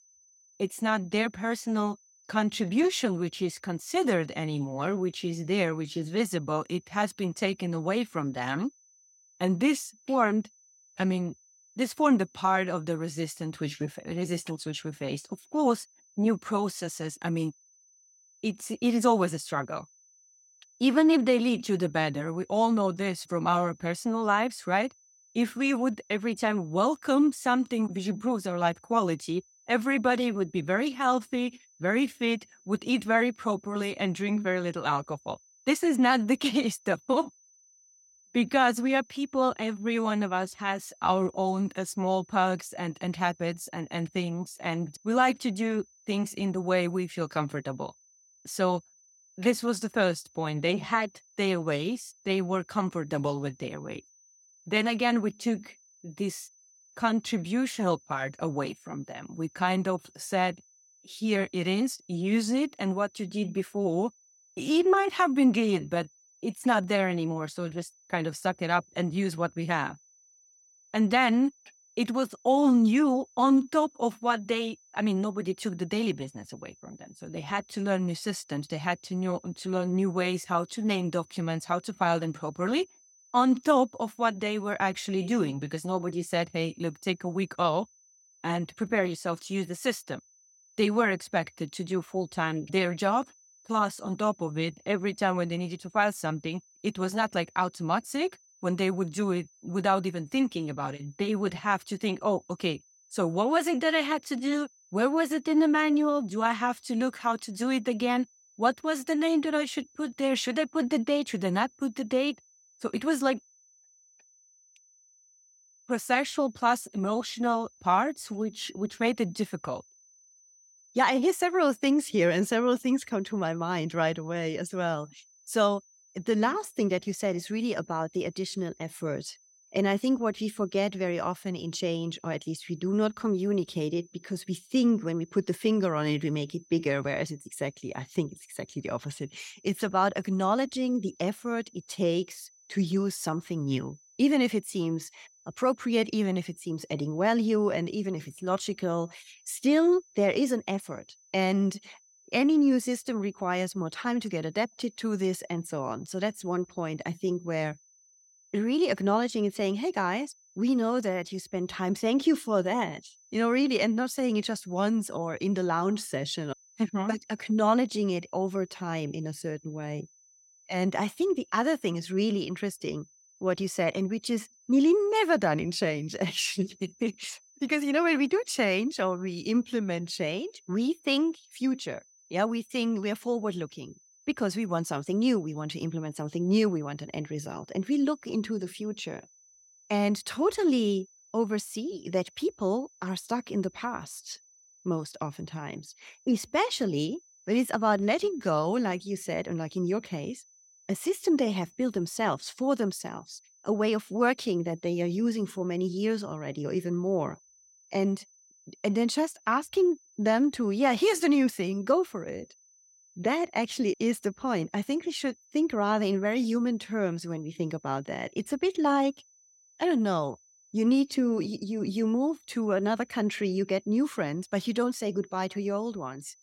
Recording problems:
high-pitched whine; faint; throughout; 6 kHz, 30 dB below the speech

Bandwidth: 16.5 kHz